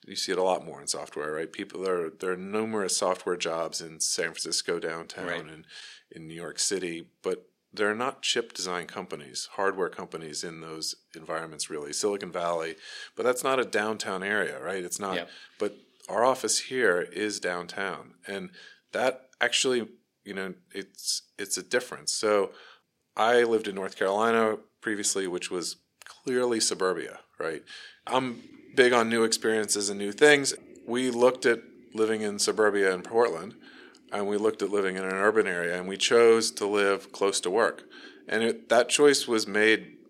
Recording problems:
thin; somewhat; fading below 450 Hz

